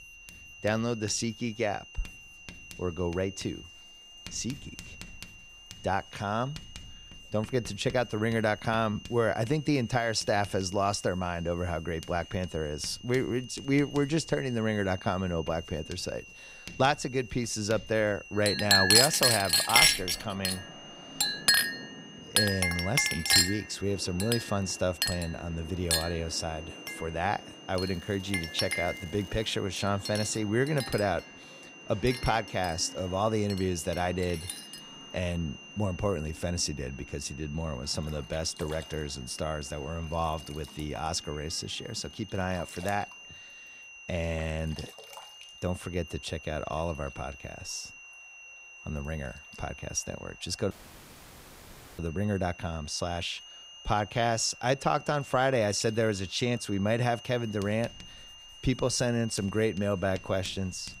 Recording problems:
household noises; very loud; throughout; 4 dB above the speech
high-pitched whine; noticeable; throughout; 3 kHz, 15 dB below the speech
rain or running water; faint; throughout; 20 dB below the speech
crackling; faint; from 28 to 30 s; 25 dB below the speech
audio cutting out; at 51 s for 1.5 s

